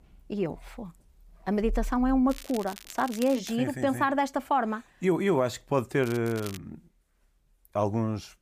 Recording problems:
crackling; noticeable; from 2.5 to 3.5 s and at 6 s; 15 dB below the speech

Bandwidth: 15 kHz